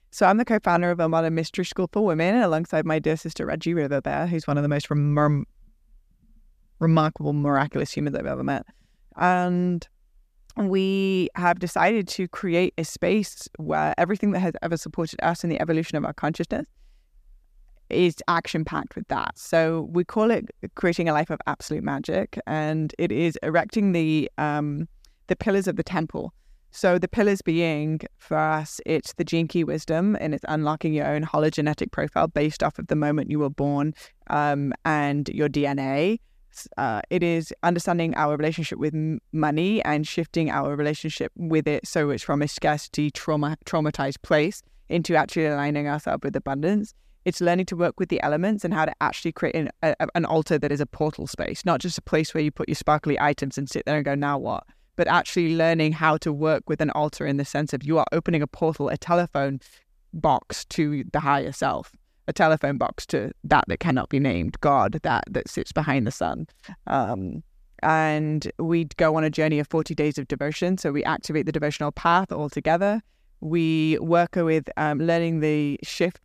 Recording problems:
none

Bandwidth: 14.5 kHz